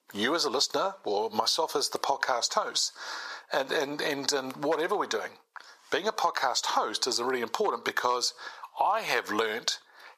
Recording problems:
thin; somewhat; fading below 800 Hz
squashed, flat; somewhat

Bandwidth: 14.5 kHz